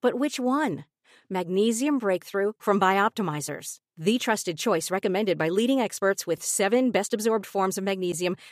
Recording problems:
none

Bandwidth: 14.5 kHz